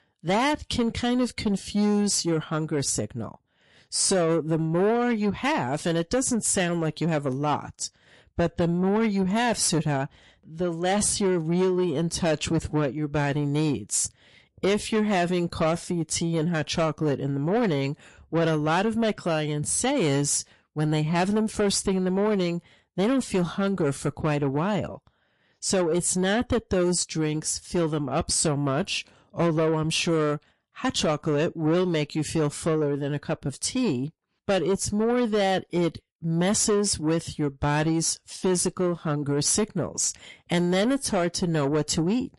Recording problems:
distortion; slight; 10 dB below the speech
garbled, watery; slightly; nothing above 11 kHz

